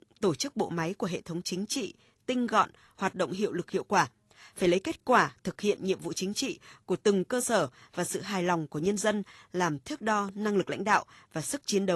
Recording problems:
garbled, watery; slightly; nothing above 12 kHz
abrupt cut into speech; at the end

